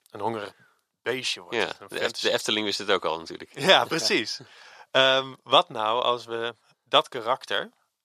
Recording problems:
thin; very; fading below 450 Hz

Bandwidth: 14 kHz